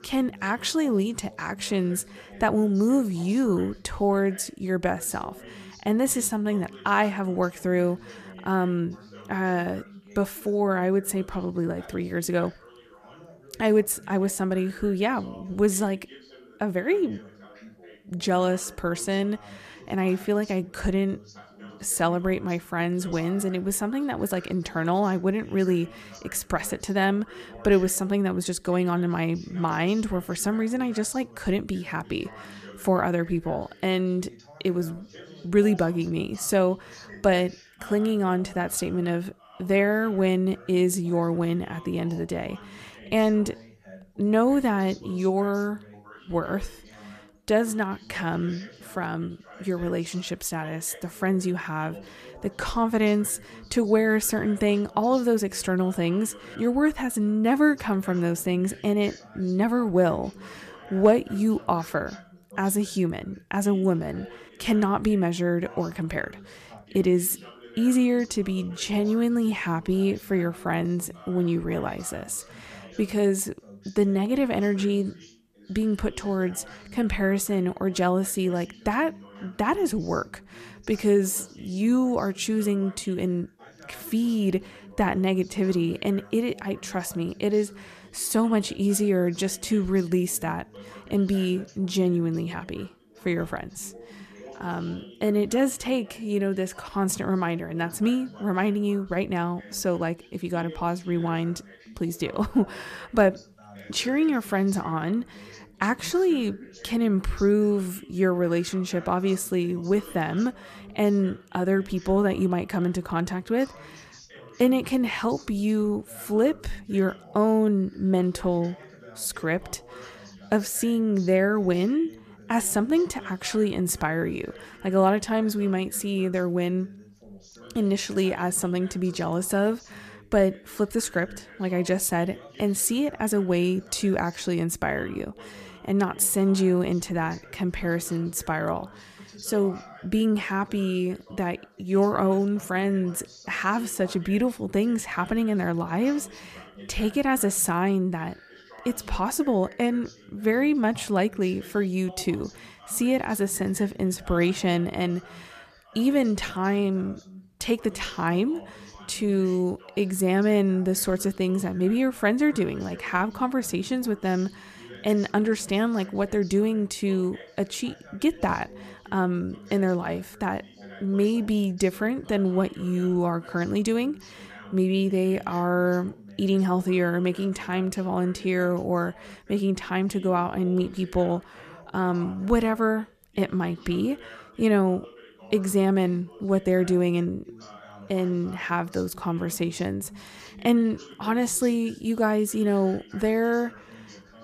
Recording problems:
background chatter; faint; throughout; 2 voices, 20 dB below the speech

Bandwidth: 14.5 kHz